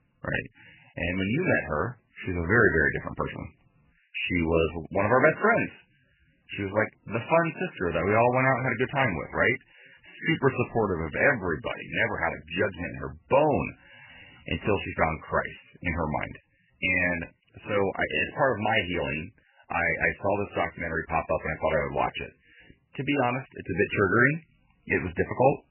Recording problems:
garbled, watery; badly; nothing above 3 kHz

